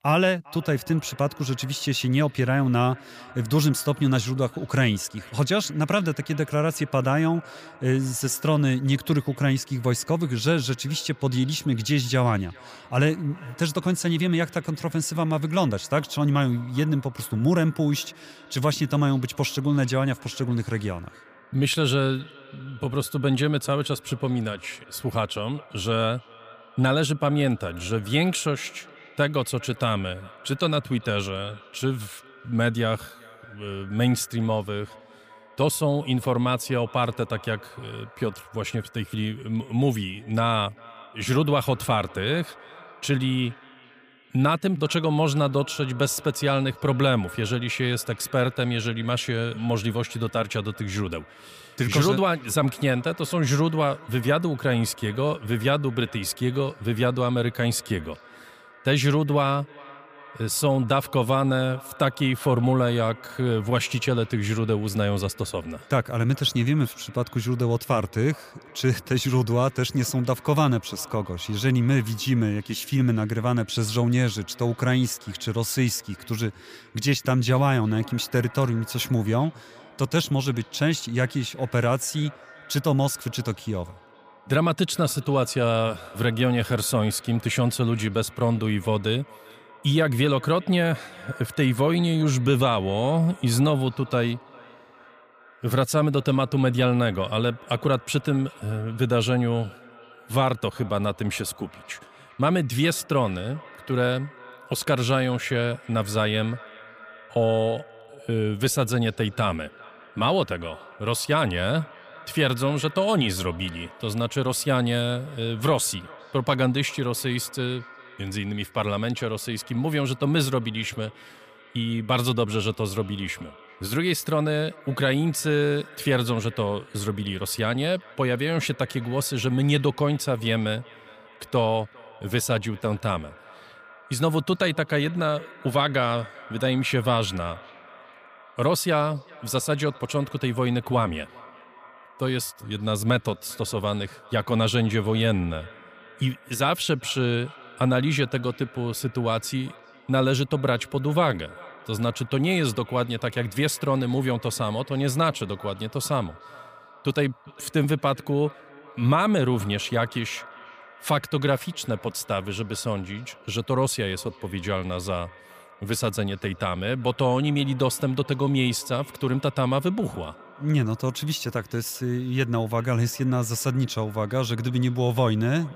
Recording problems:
echo of what is said; faint; throughout; 400 ms later, 20 dB below the speech

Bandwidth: 15 kHz